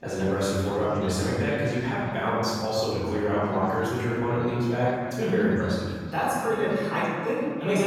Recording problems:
room echo; strong; dies away in 1.7 s
off-mic speech; far
background chatter; noticeable; throughout; 4 voices, 15 dB below the speech
abrupt cut into speech; at the end

